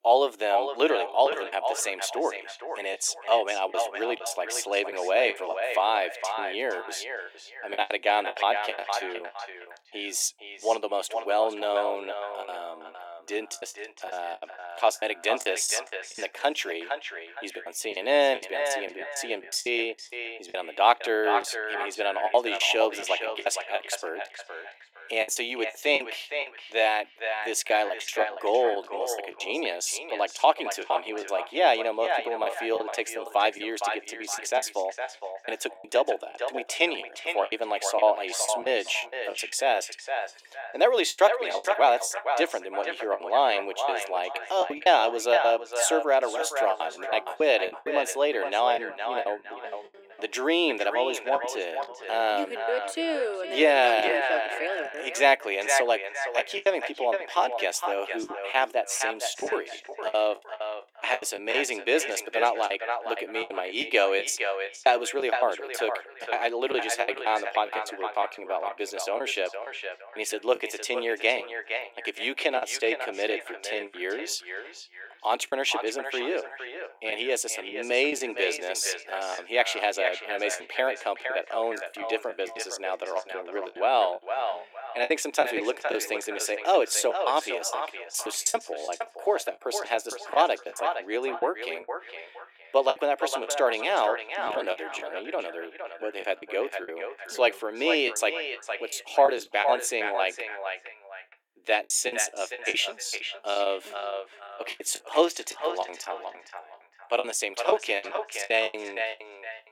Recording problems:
echo of what is said; strong; throughout; 460 ms later, 7 dB below the speech
thin; very; fading below 300 Hz
choppy; very; 12% of the speech affected

